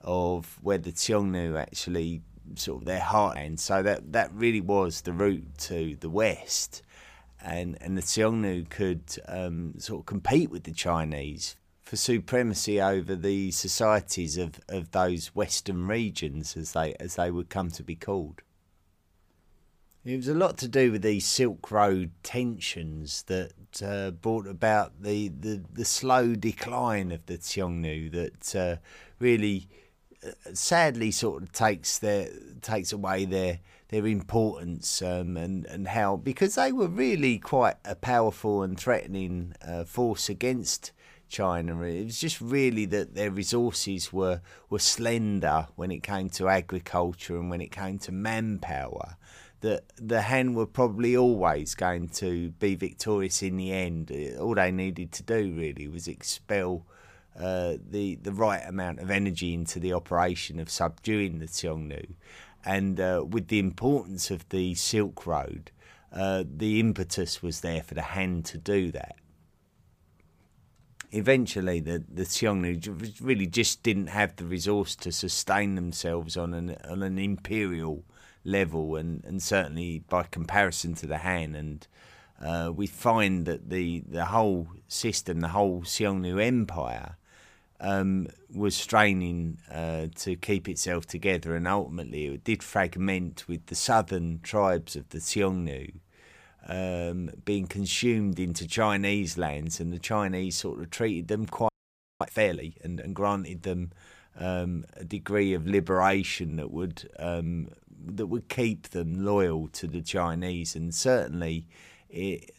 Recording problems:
audio freezing; at 1:42 for 0.5 s

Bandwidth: 15 kHz